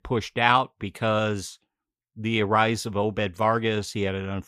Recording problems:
none

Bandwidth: 15.5 kHz